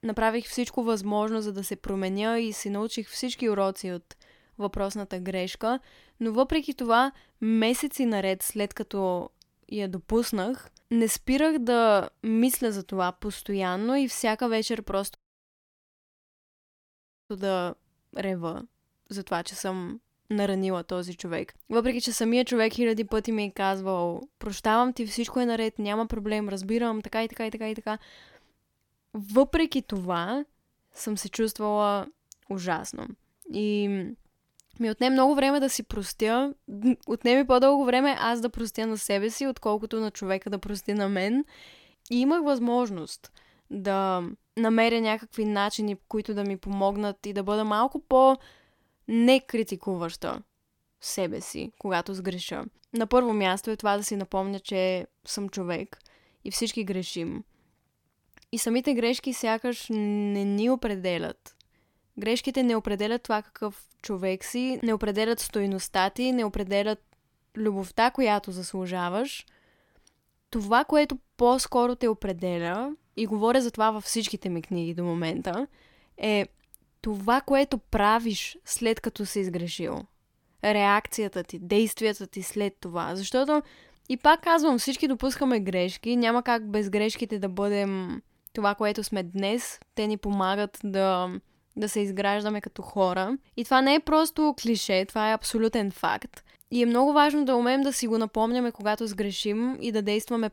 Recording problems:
audio cutting out; at 15 s for 2 s

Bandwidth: 17.5 kHz